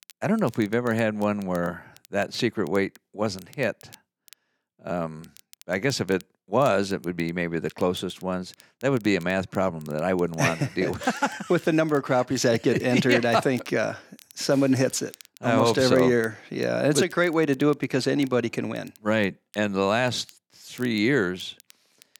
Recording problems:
crackle, like an old record; faint; 25 dB below the speech

